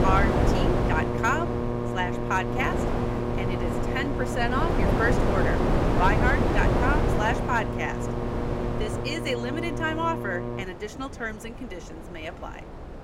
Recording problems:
wind noise on the microphone; heavy; 2 dB below the speech
electrical hum; loud; until 11 s; 60 Hz, 6 dB below the speech

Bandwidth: 16 kHz